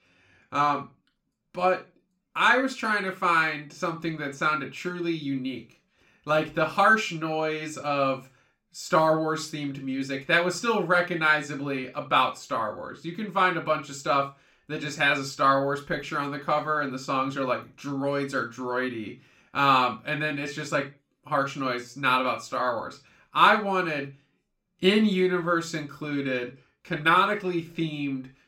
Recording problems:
room echo; slight; dies away in 0.3 s
off-mic speech; somewhat distant

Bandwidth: 16 kHz